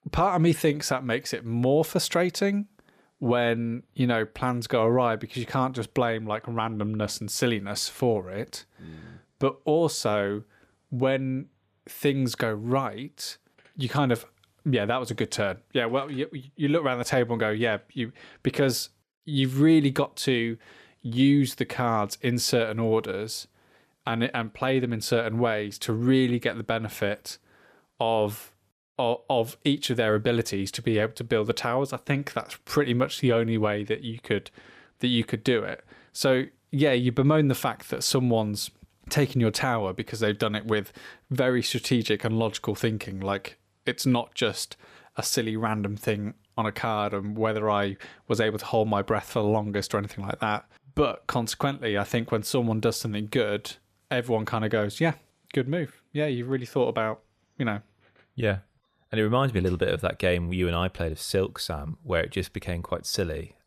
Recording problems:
none

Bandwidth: 14.5 kHz